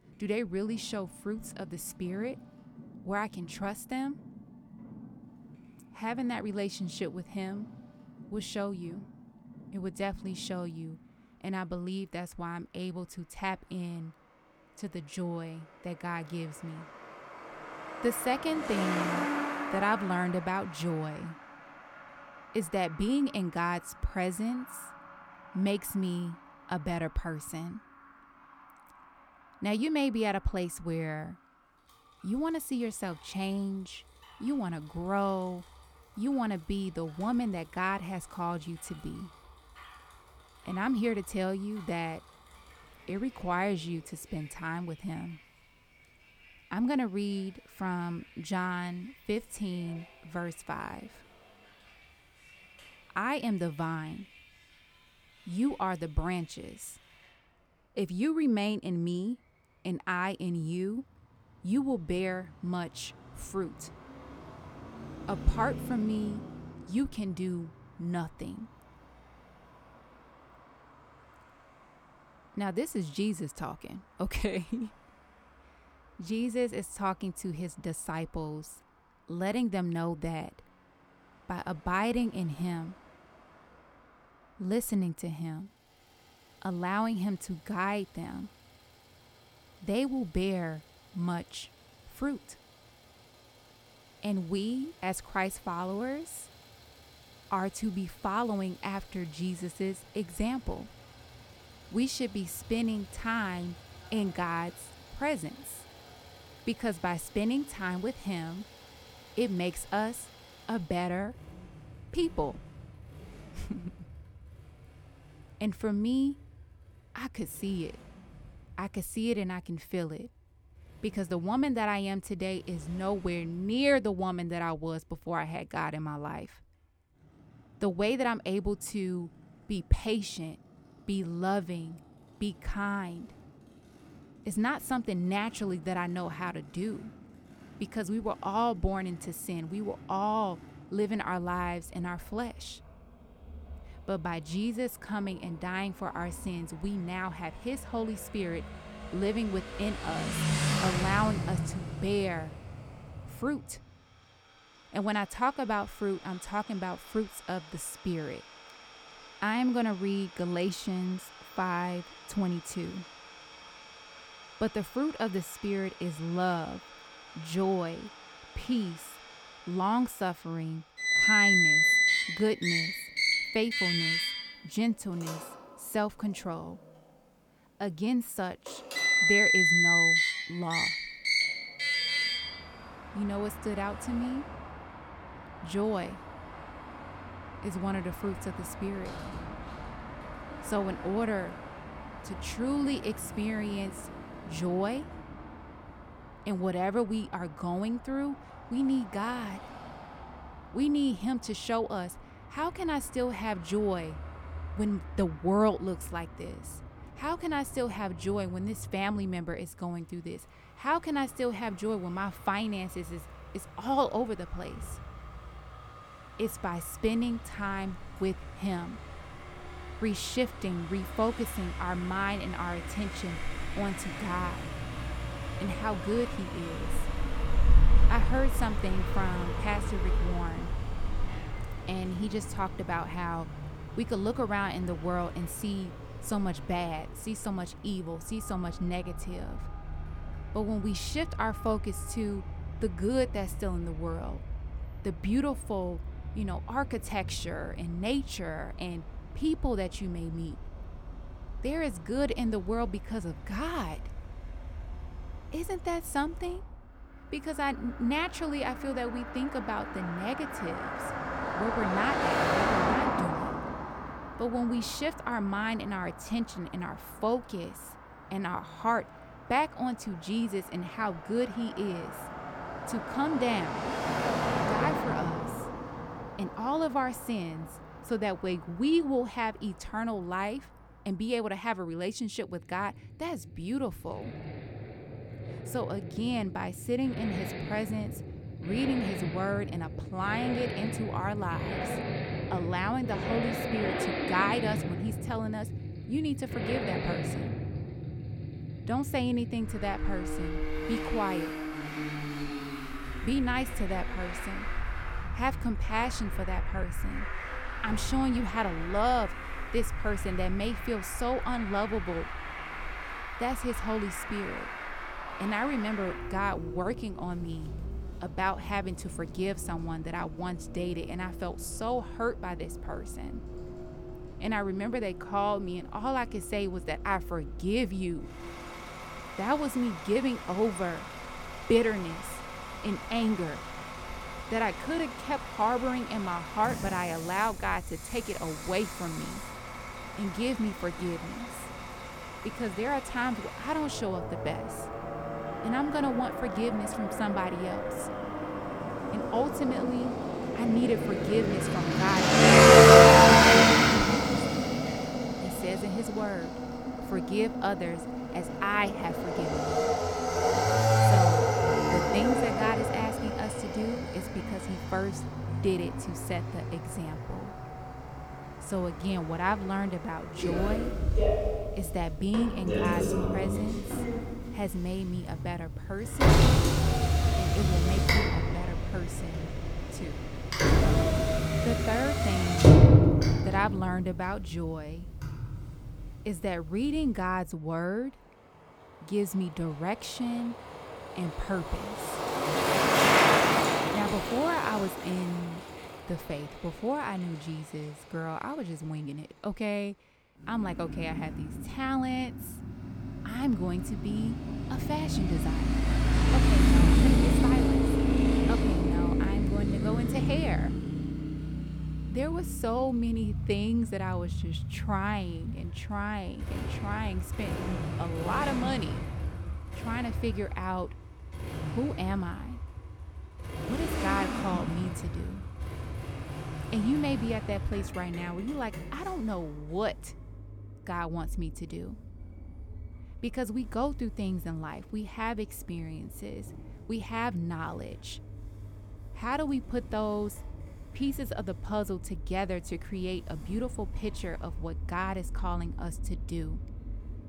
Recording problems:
traffic noise; very loud; throughout; 4 dB above the speech

